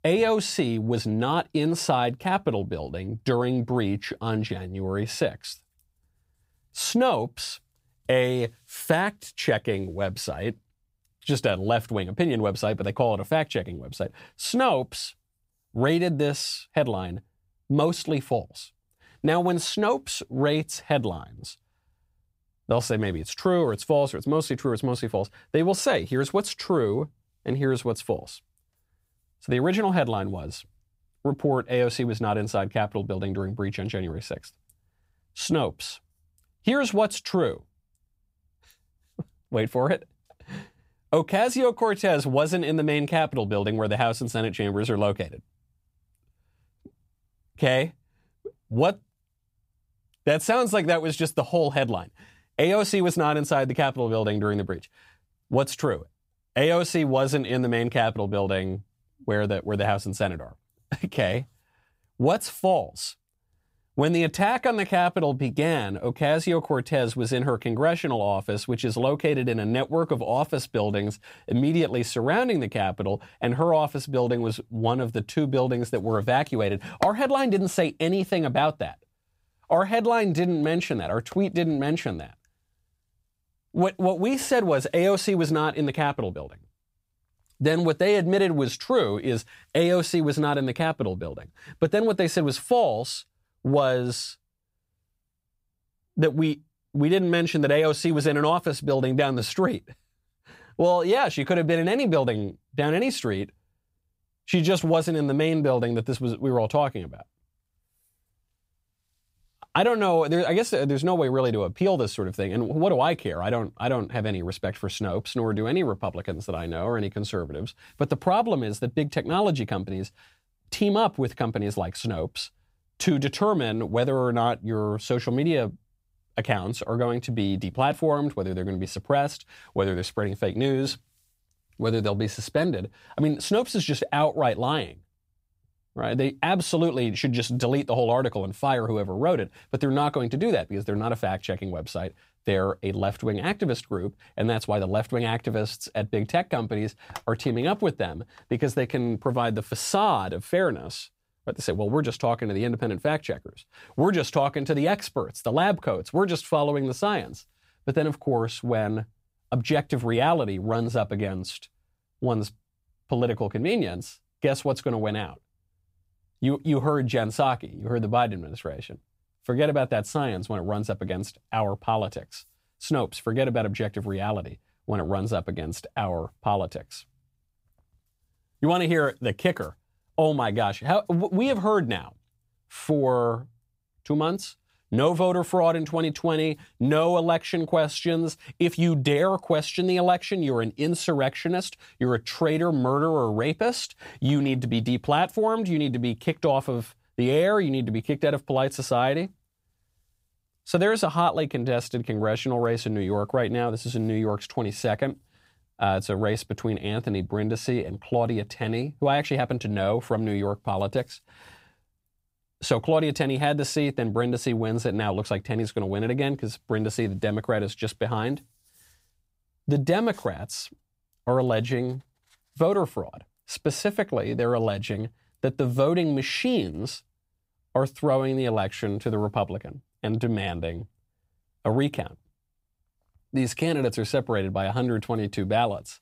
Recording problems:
none

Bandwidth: 15.5 kHz